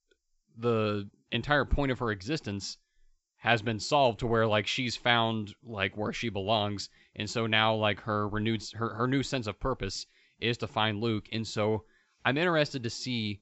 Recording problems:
high frequencies cut off; noticeable; nothing above 7.5 kHz

